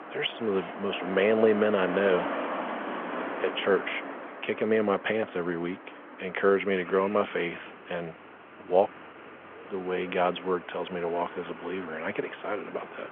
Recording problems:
phone-call audio; nothing above 3.5 kHz
traffic noise; loud; throughout; 10 dB below the speech

